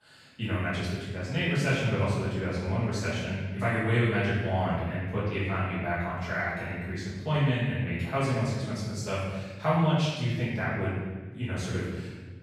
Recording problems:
room echo; strong; dies away in 1.3 s
off-mic speech; far

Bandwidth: 14.5 kHz